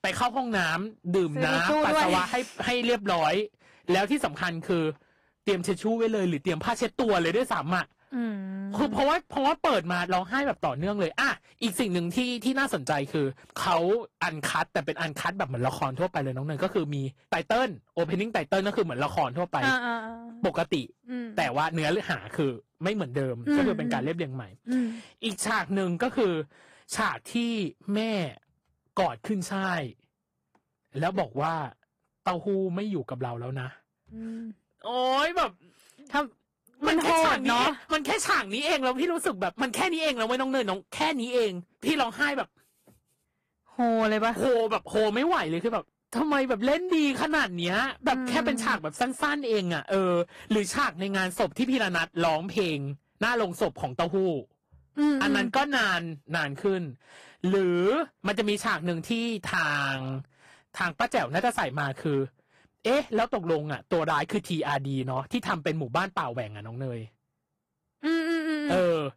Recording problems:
distortion; slight; 4% of the sound clipped
garbled, watery; slightly

